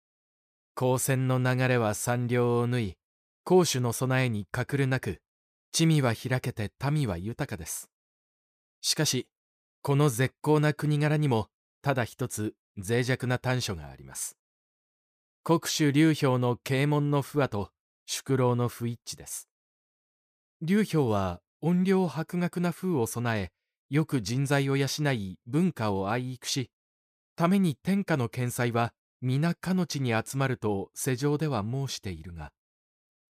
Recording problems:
none

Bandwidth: 15 kHz